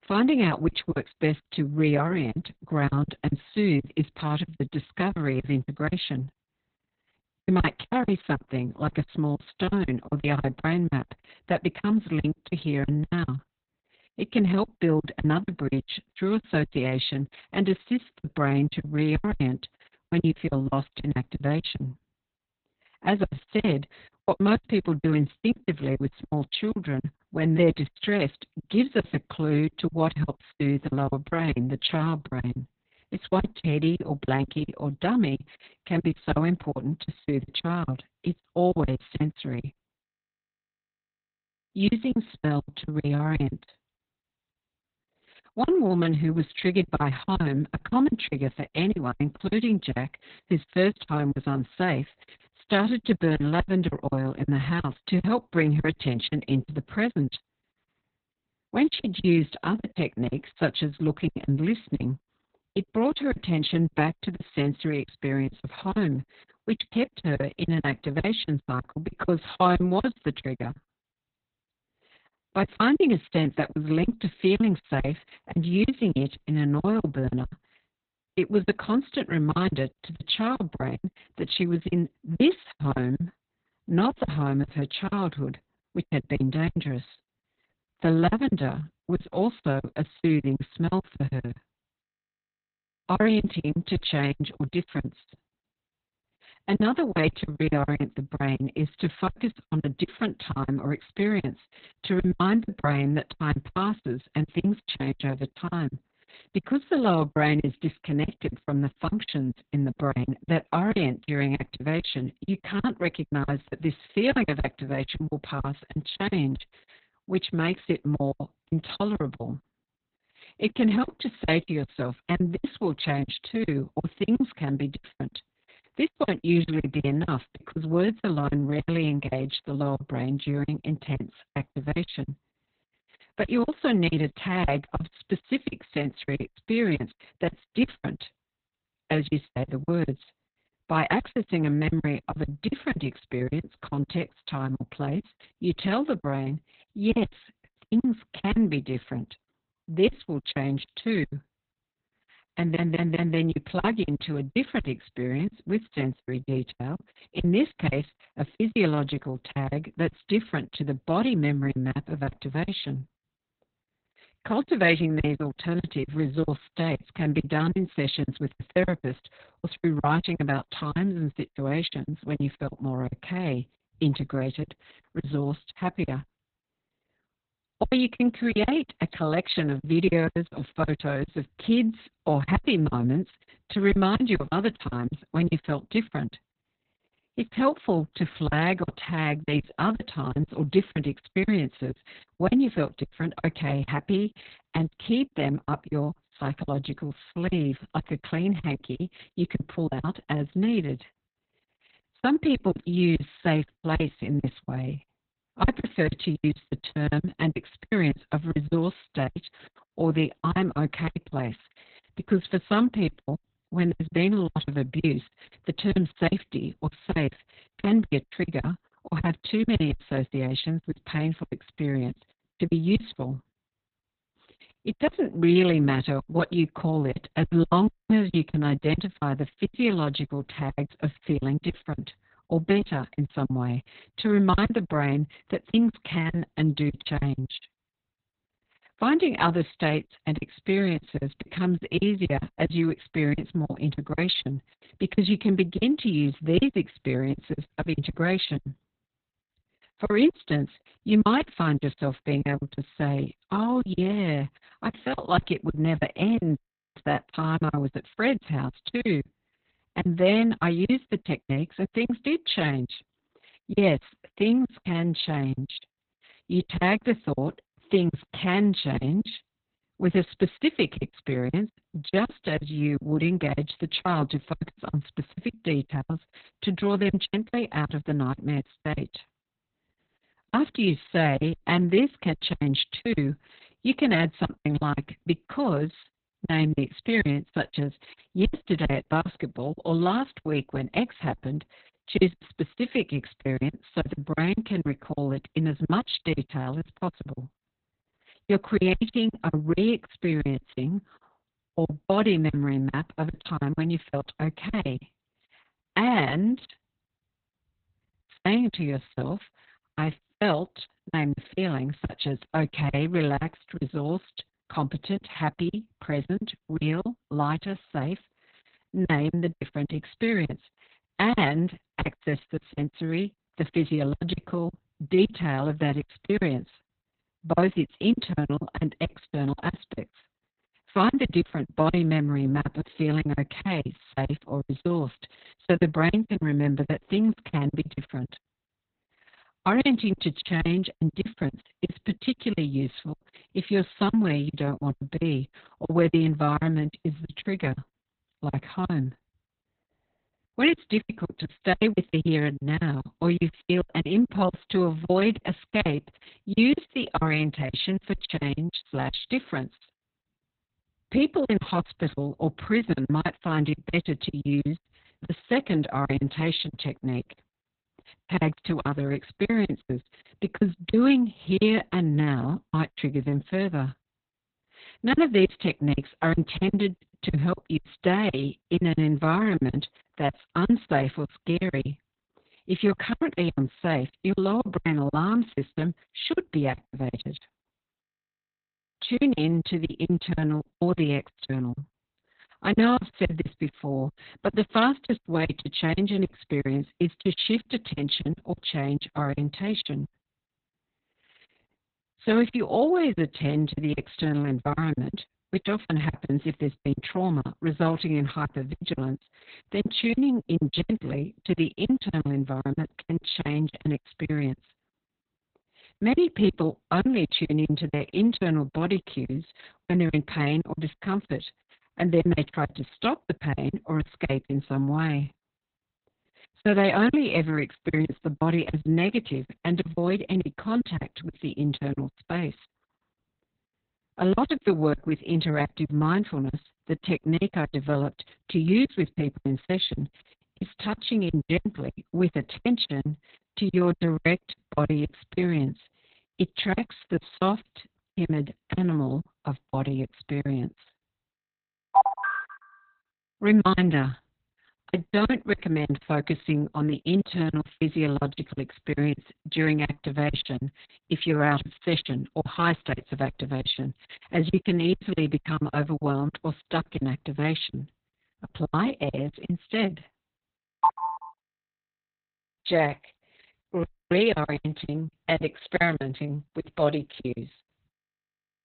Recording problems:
garbled, watery; badly; nothing above 4 kHz
choppy; very; 16% of the speech affected
audio stuttering; at 2:33
audio cutting out; at 3:48, at 4:17 and at 7:54

